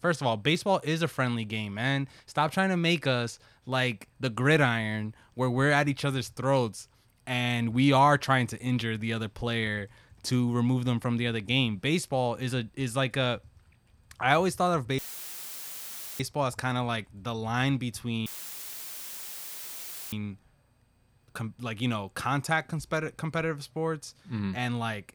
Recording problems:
audio cutting out; filled with static; at 15 s for 1 s and at 18 s for 2 s

